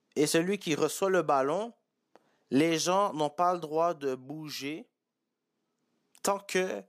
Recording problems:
none

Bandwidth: 15 kHz